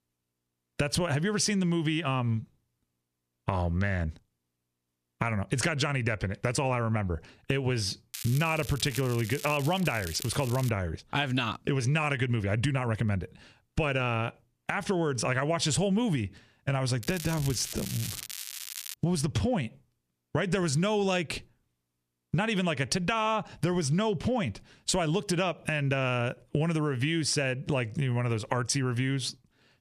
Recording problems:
squashed, flat; somewhat
crackling; noticeable; from 8 to 11 s and from 17 to 19 s; 10 dB below the speech

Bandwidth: 14.5 kHz